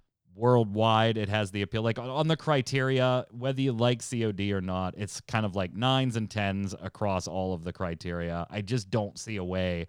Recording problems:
none

